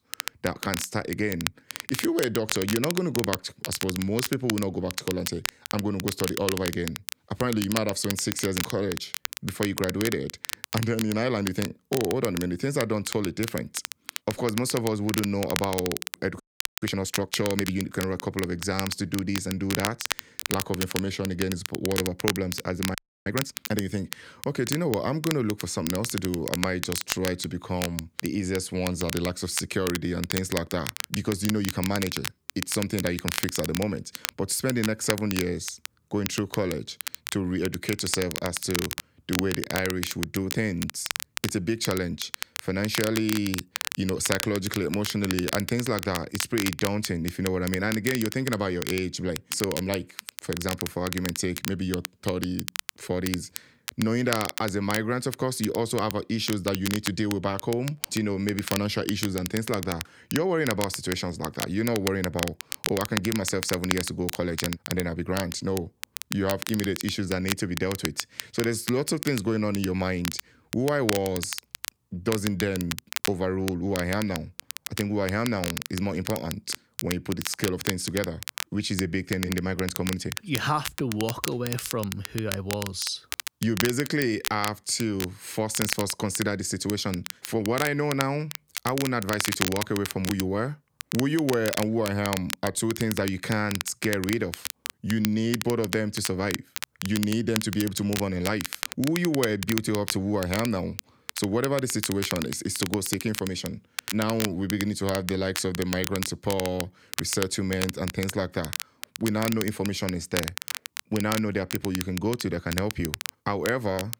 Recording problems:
crackle, like an old record; loud; 6 dB below the speech
audio freezing; at 16 s and at 23 s

